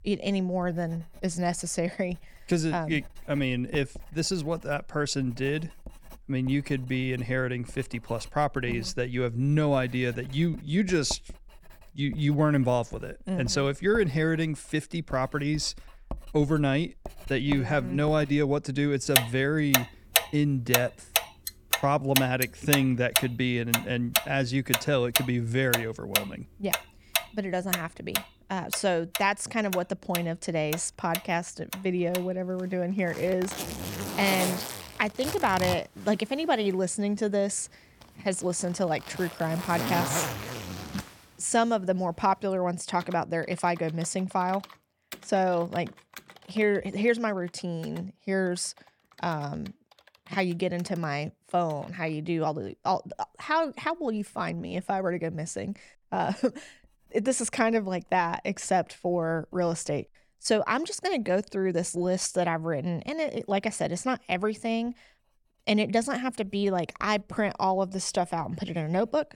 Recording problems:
household noises; loud; throughout; 3 dB below the speech

